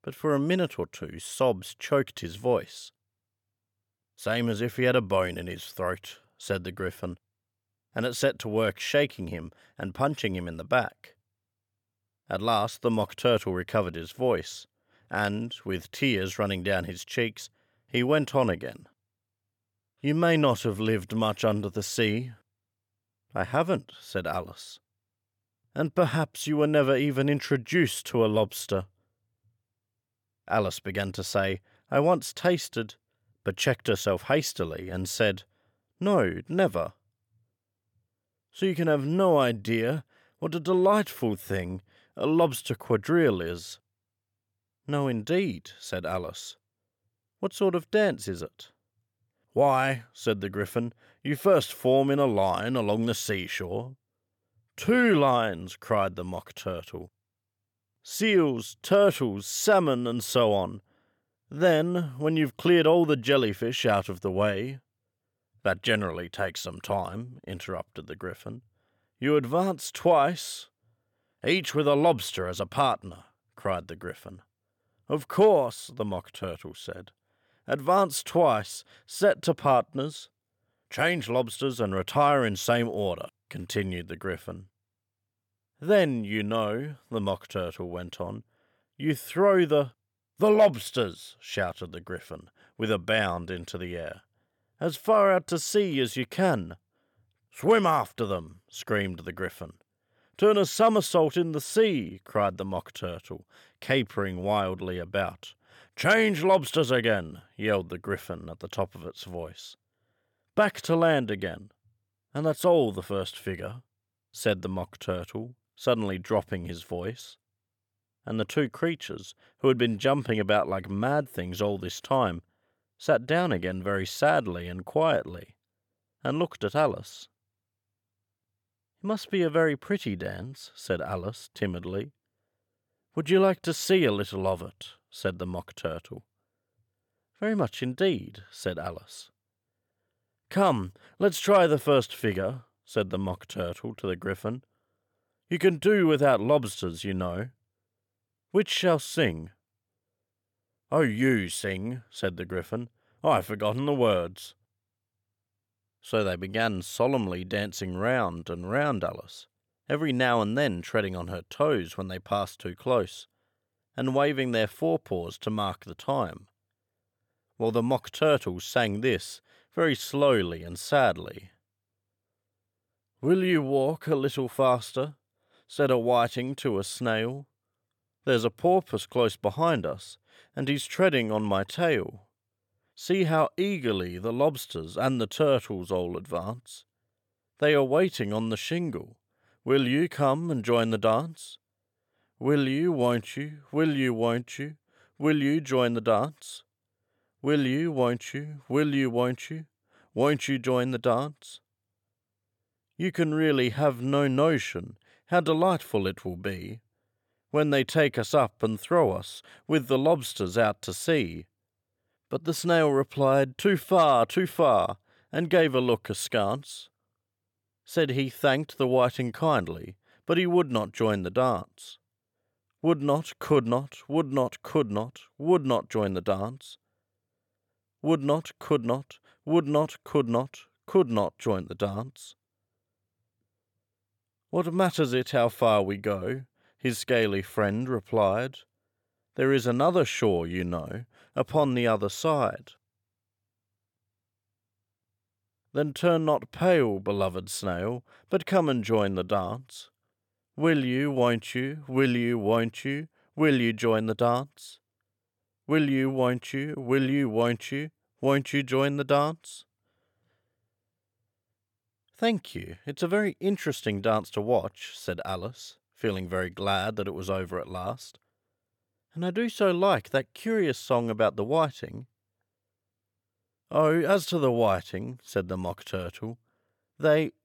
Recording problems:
none

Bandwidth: 17.5 kHz